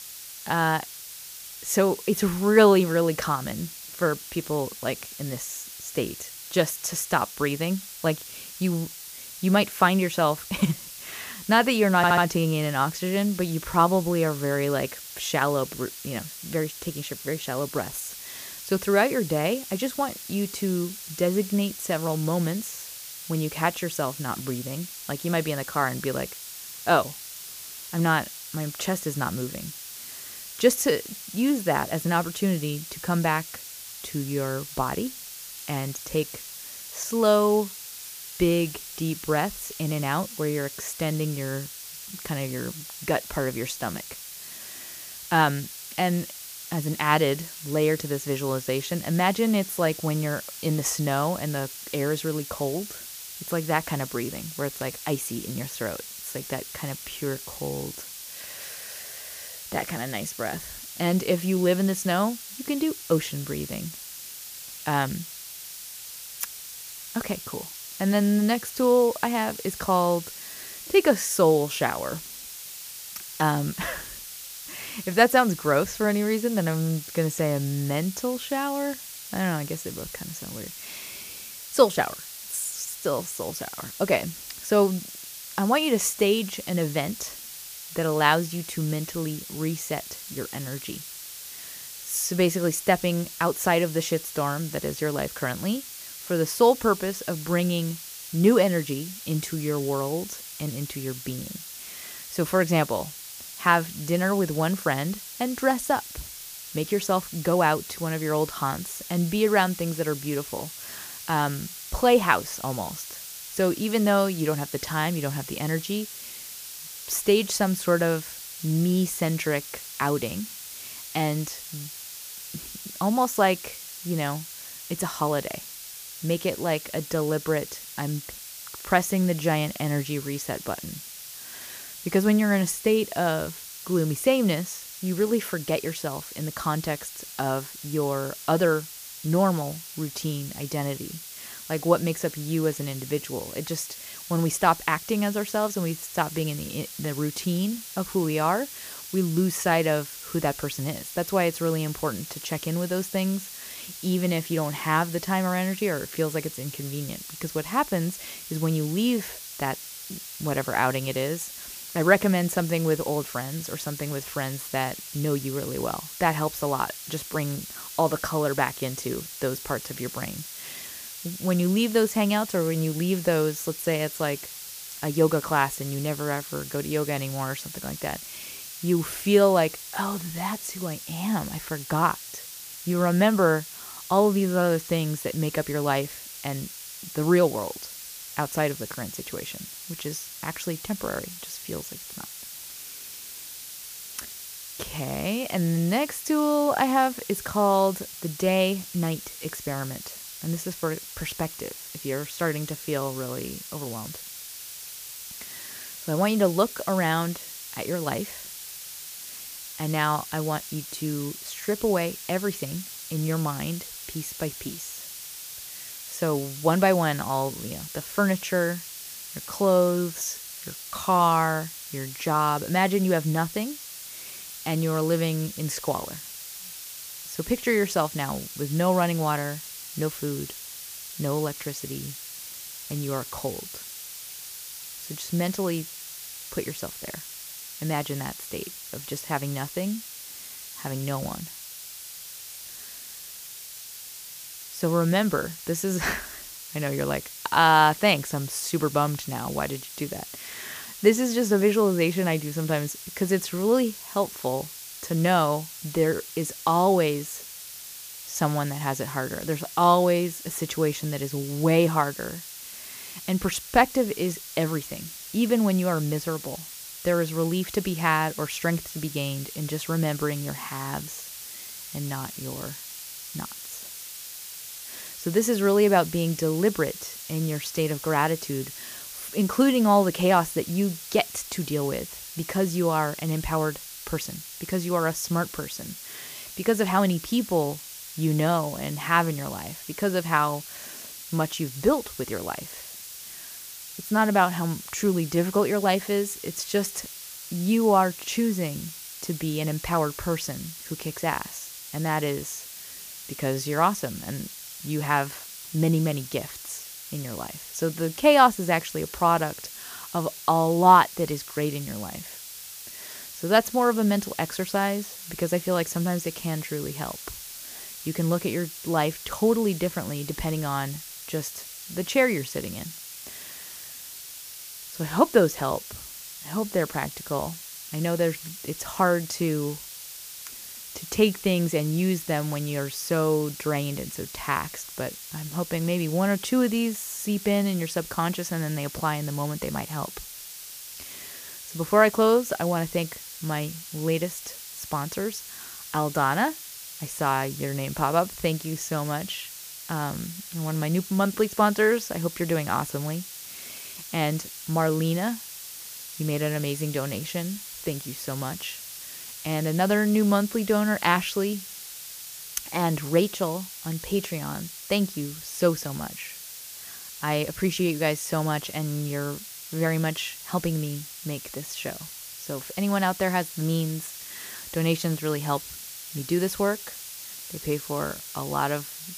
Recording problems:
hiss; noticeable; throughout; 10 dB below the speech
audio stuttering; at 12 s

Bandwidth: 15 kHz